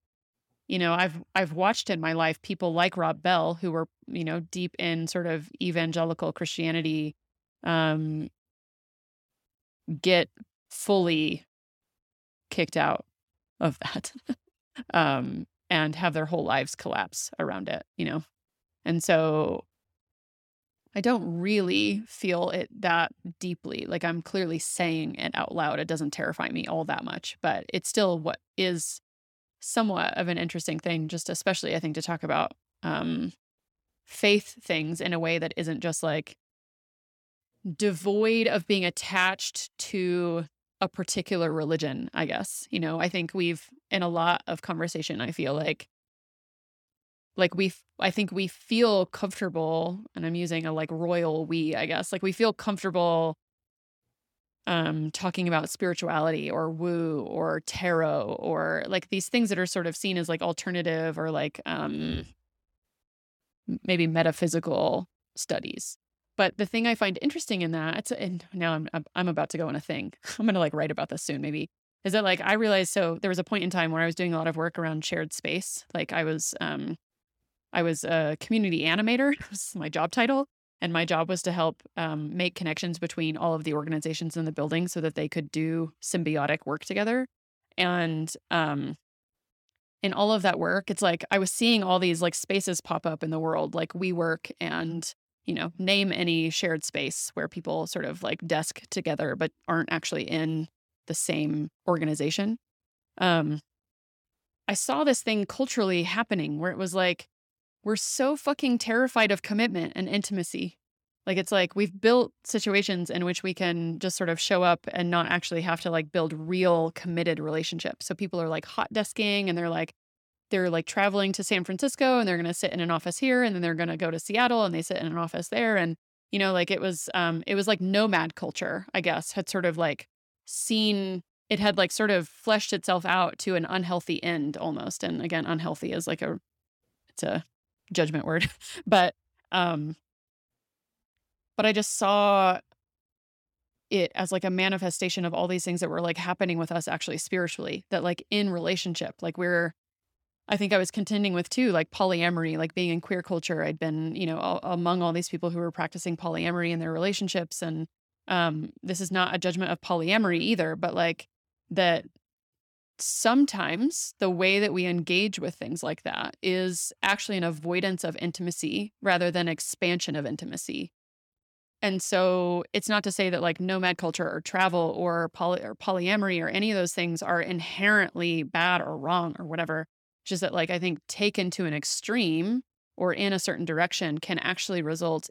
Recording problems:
none

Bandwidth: 18 kHz